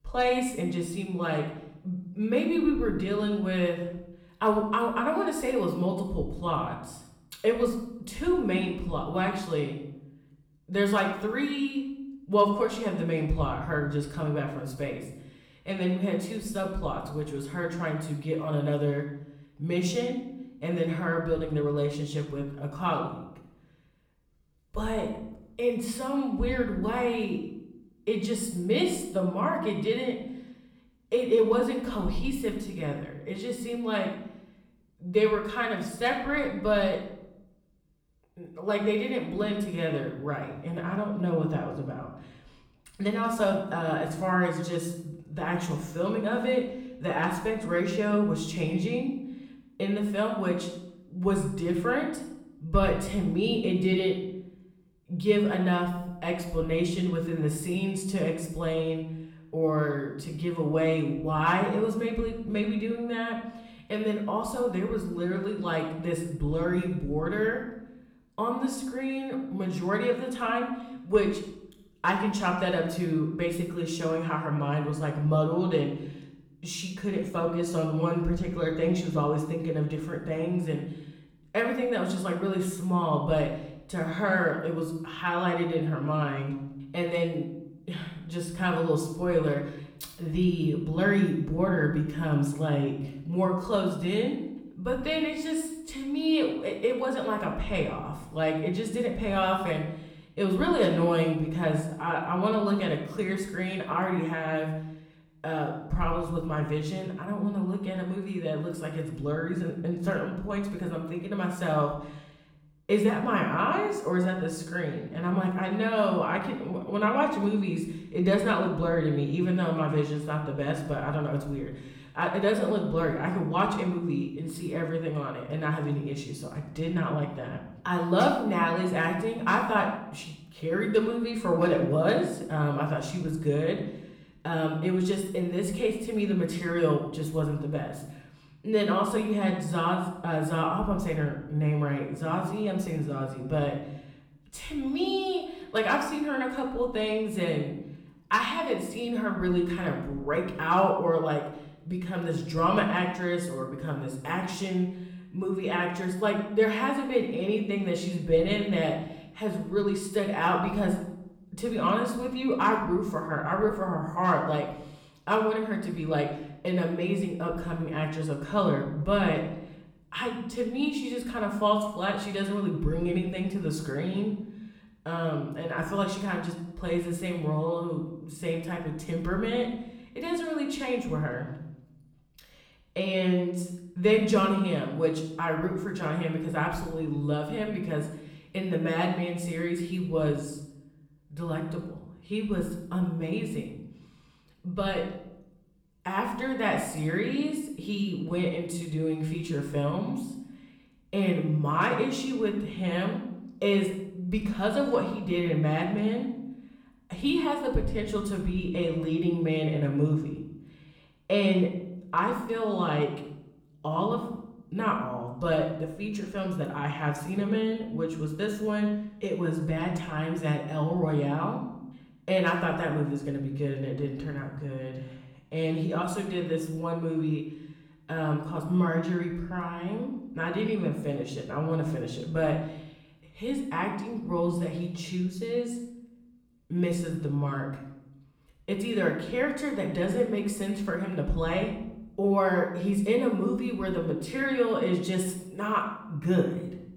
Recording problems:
off-mic speech; far
room echo; noticeable; dies away in 0.7 s

